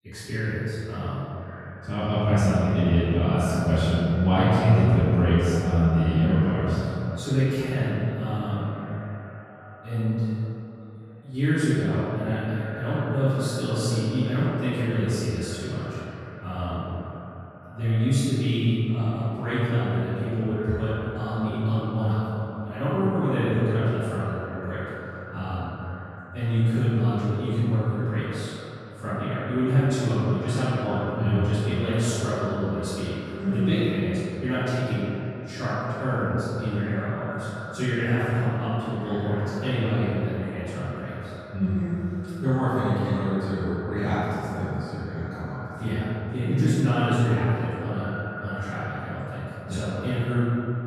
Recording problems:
room echo; strong; dies away in 2.5 s
off-mic speech; far
echo of what is said; noticeable; throughout; 520 ms later, 15 dB below the speech

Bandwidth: 14.5 kHz